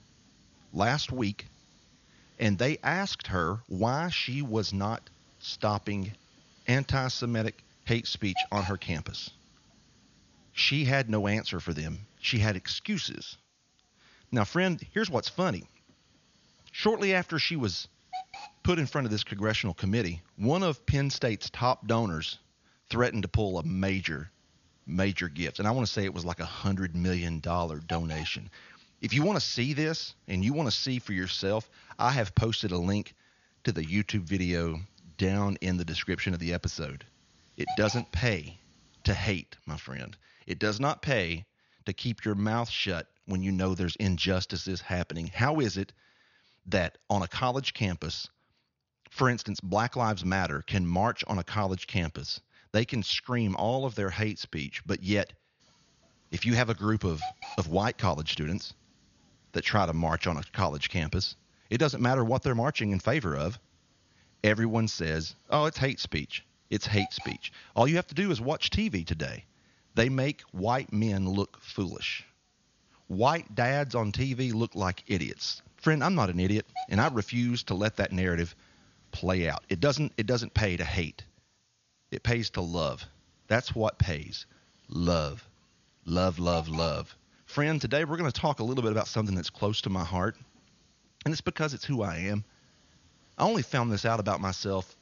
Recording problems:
high frequencies cut off; noticeable; nothing above 7 kHz
hiss; noticeable; until 39 s and from 56 s on; 15 dB below the speech

